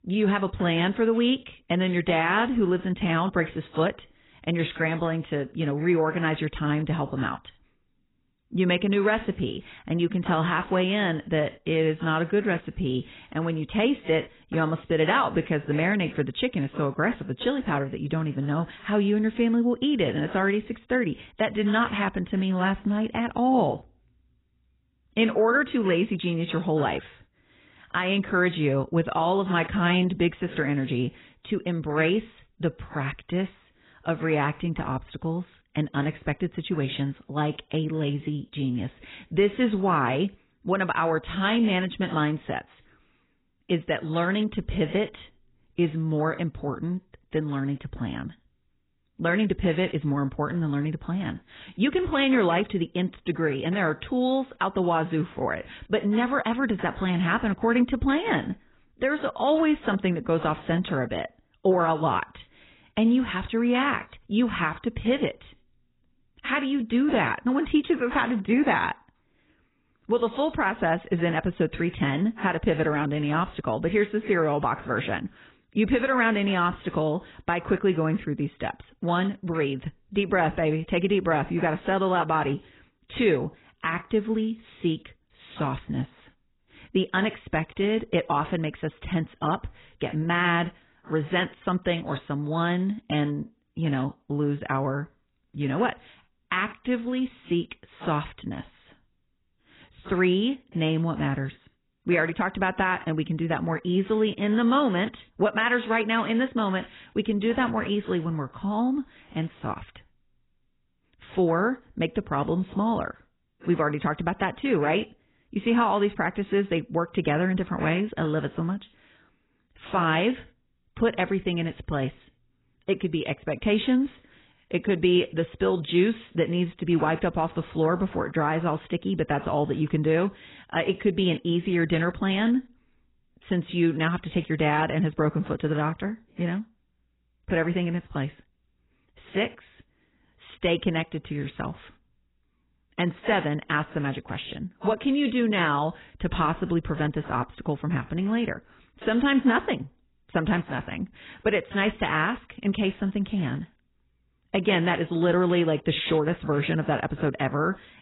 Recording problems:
garbled, watery; badly; nothing above 4 kHz

